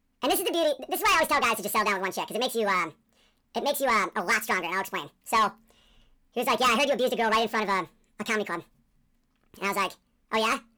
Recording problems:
wrong speed and pitch; too fast and too high; 1.7 times normal speed
distortion; slight; 10 dB below the speech

